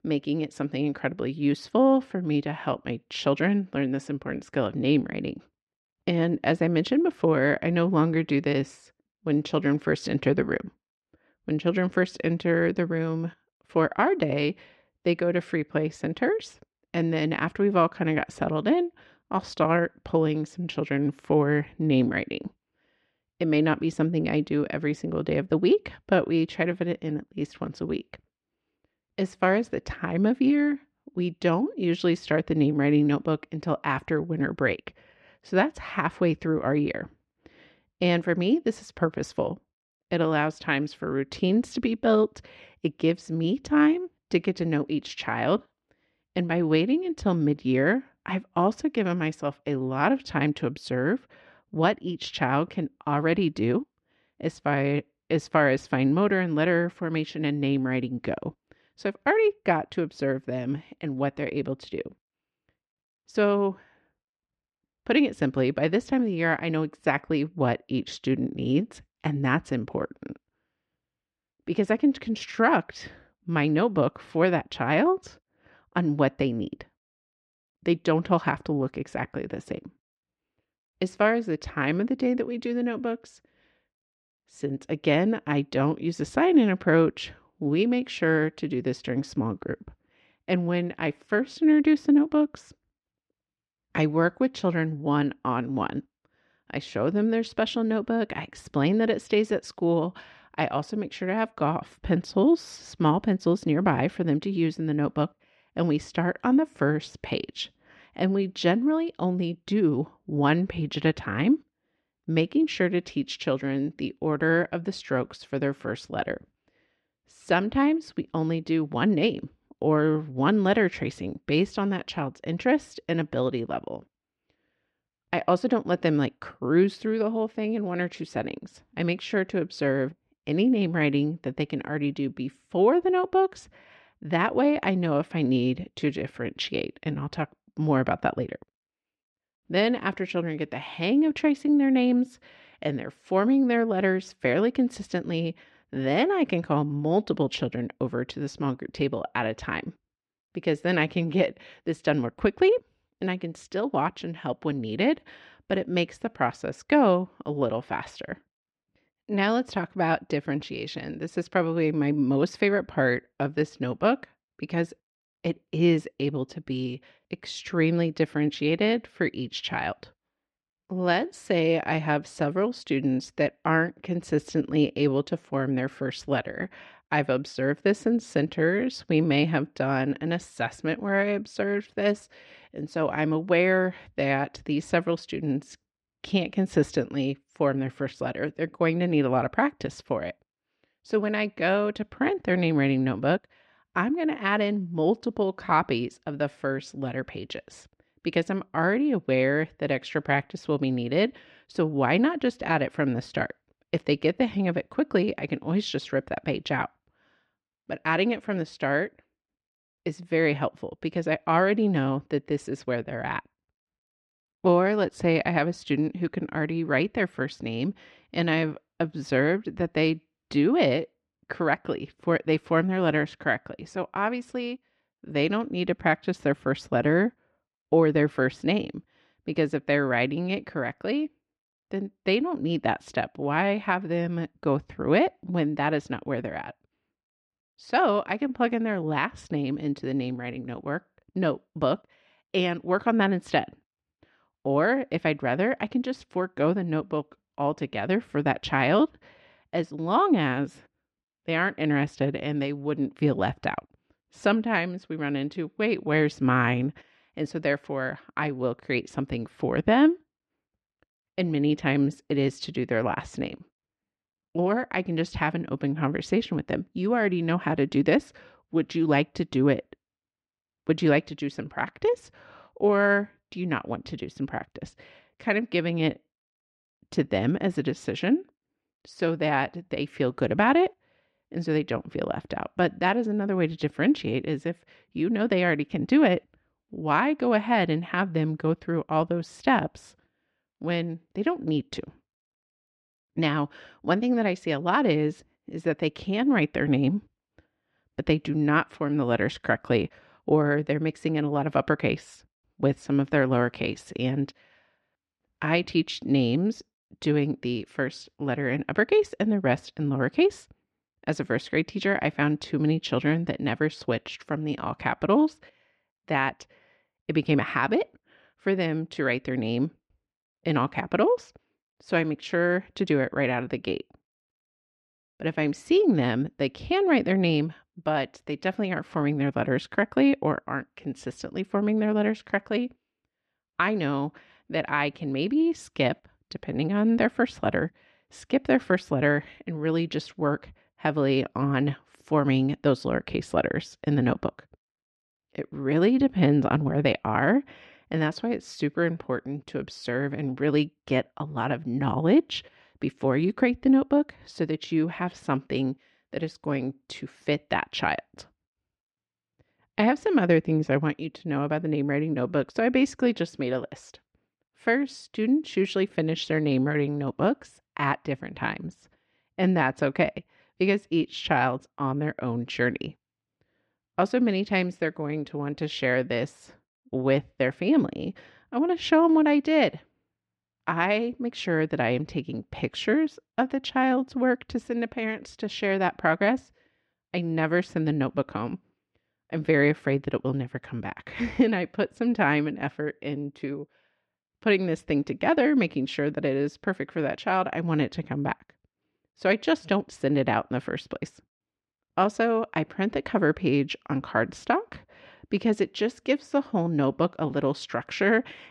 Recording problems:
muffled; slightly; fading above 2.5 kHz

